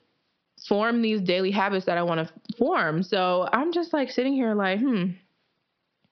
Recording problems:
high frequencies cut off; noticeable; nothing above 5.5 kHz
squashed, flat; somewhat

